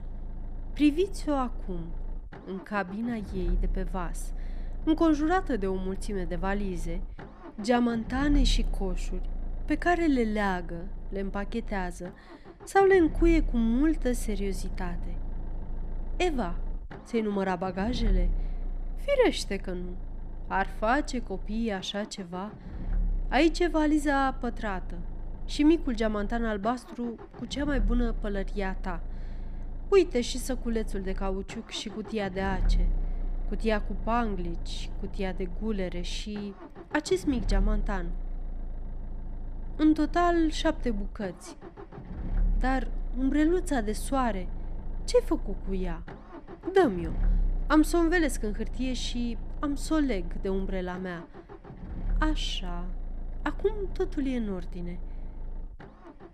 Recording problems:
low rumble; faint; throughout; 20 dB below the speech

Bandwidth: 14.5 kHz